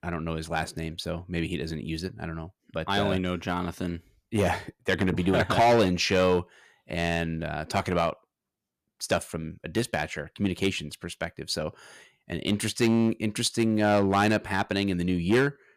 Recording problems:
distortion; slight; 3% of the sound clipped

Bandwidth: 14.5 kHz